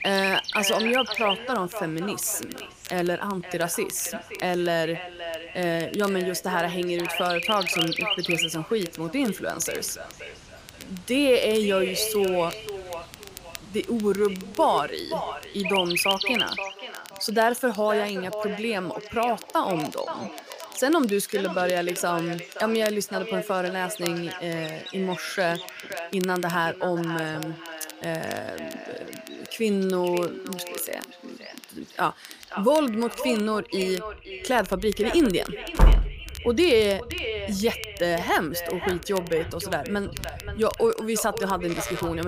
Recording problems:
echo of what is said; strong; throughout; 520 ms later, 10 dB below the speech
animal sounds; loud; throughout; 4 dB below the speech
crackle, like an old record; noticeable; 20 dB below the speech
door banging; loud; at 36 s; peak 5 dB above the speech
abrupt cut into speech; at the end

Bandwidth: 15 kHz